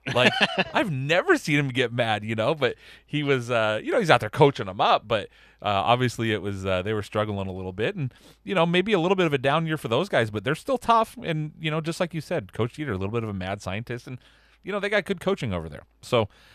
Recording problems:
none

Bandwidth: 14.5 kHz